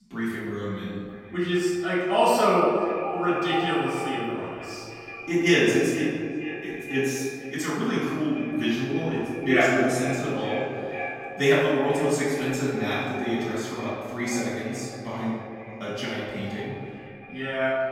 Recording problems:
echo of what is said; strong; throughout; 470 ms later, 10 dB below the speech
room echo; strong; dies away in 1.7 s
off-mic speech; far

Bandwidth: 16.5 kHz